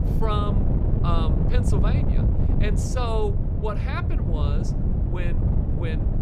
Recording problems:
wind noise on the microphone; heavy; 3 dB below the speech

